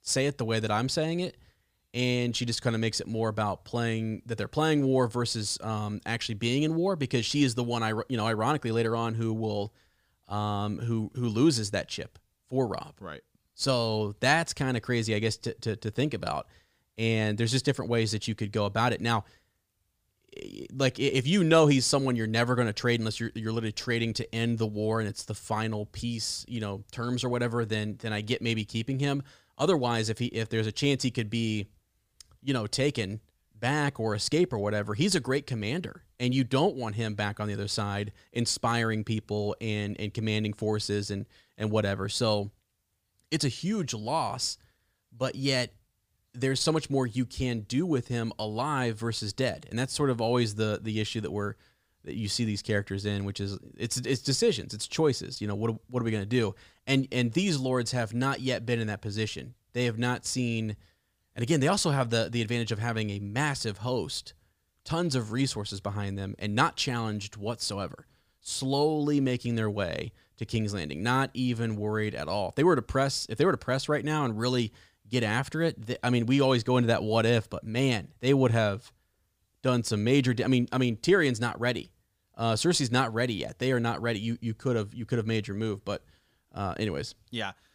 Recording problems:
none

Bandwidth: 15 kHz